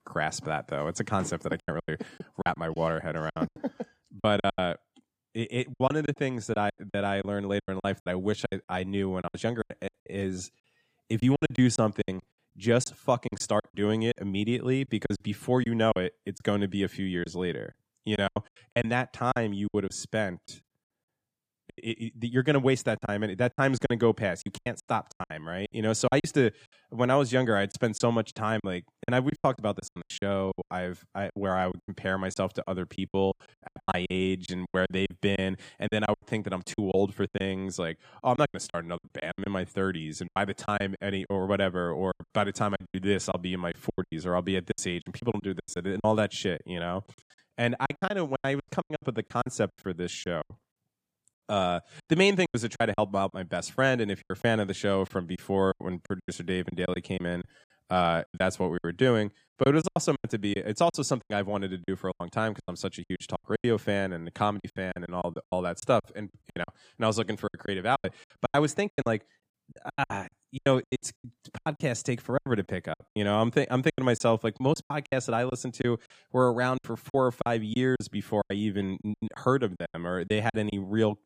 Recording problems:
choppy; very; 15% of the speech affected

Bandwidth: 15 kHz